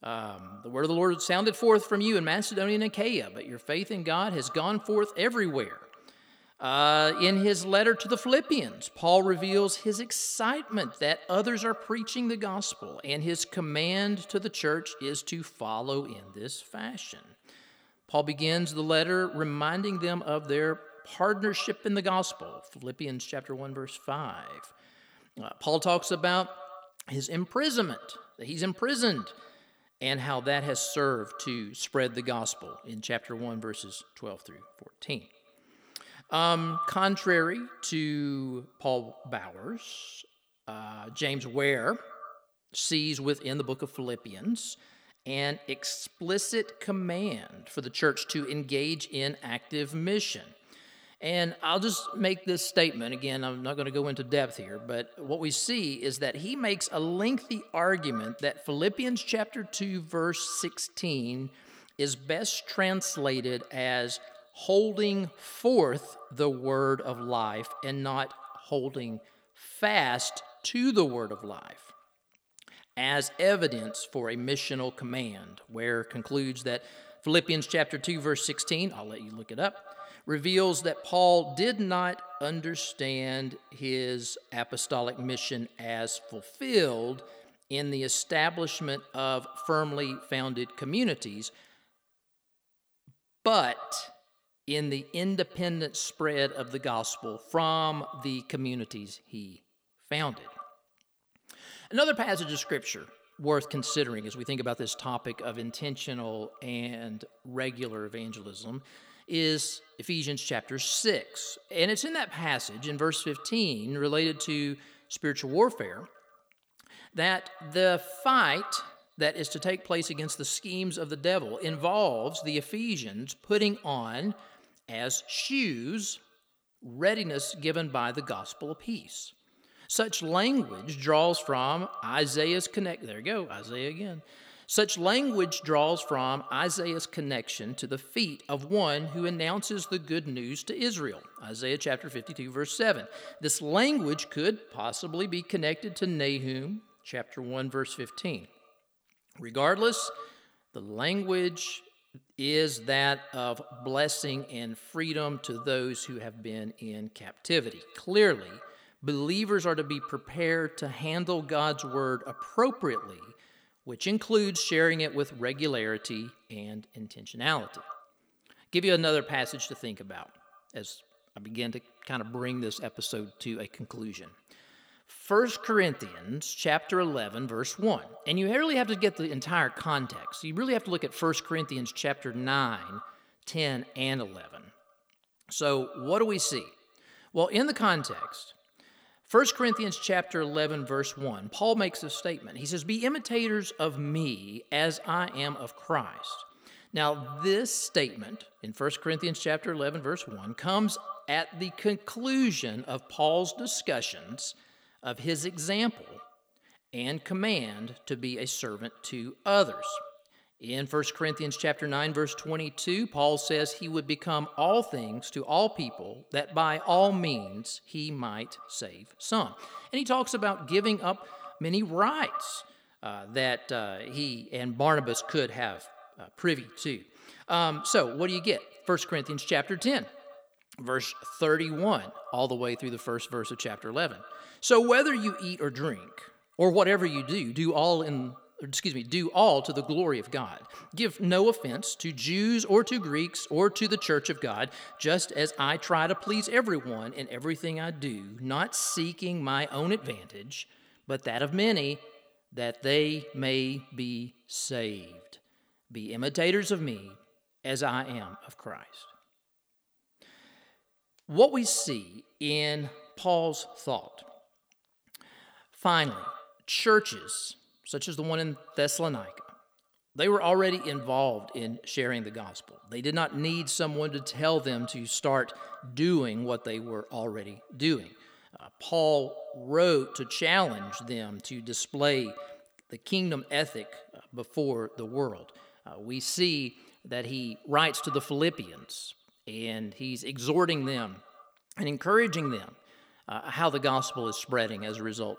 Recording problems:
echo of what is said; noticeable; throughout; 120 ms later, 15 dB below the speech

